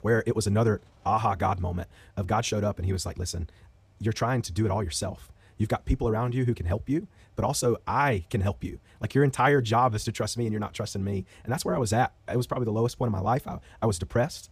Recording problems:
wrong speed, natural pitch; too fast; 1.5 times normal speed

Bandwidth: 15 kHz